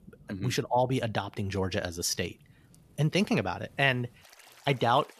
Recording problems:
rain or running water; faint; throughout; 30 dB below the speech

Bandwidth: 14.5 kHz